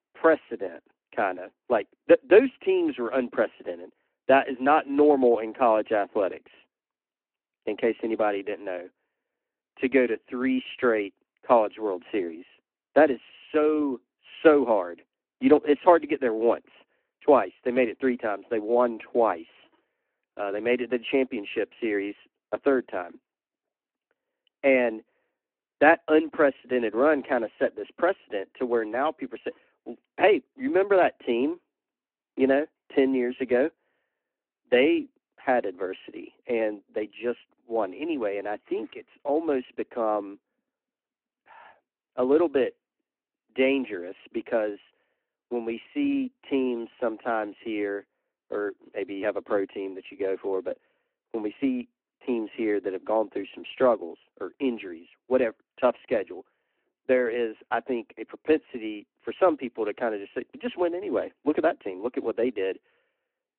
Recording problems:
phone-call audio

